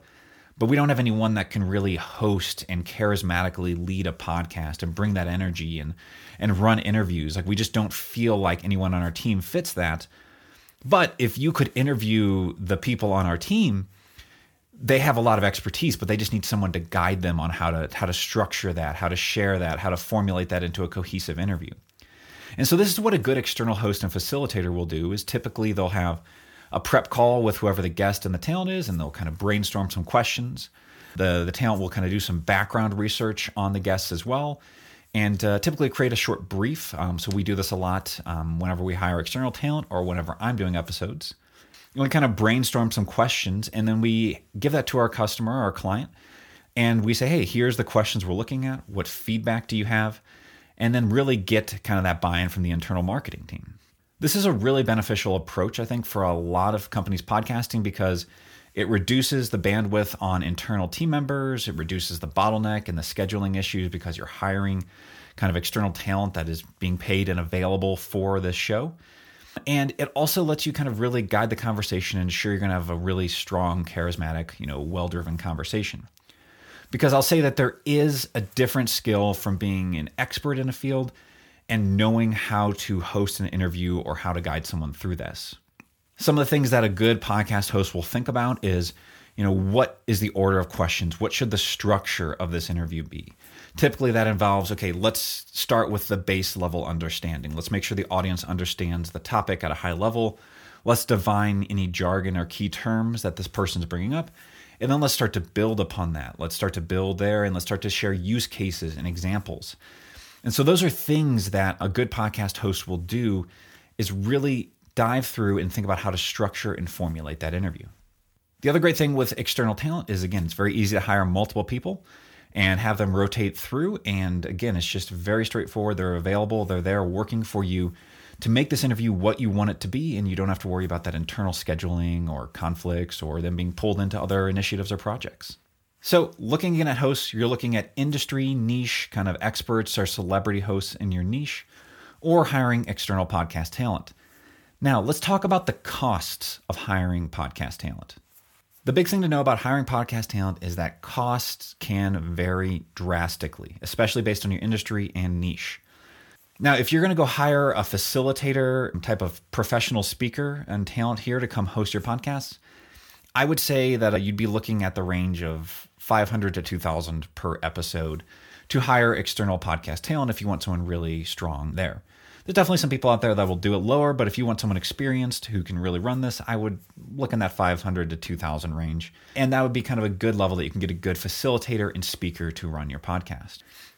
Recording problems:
none

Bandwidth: 18.5 kHz